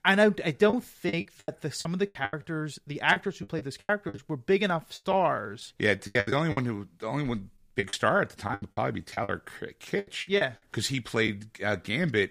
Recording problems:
choppy; very; from 0.5 to 4 s, from 5 to 6.5 s and from 8 to 11 s; 17% of the speech affected

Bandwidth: 15 kHz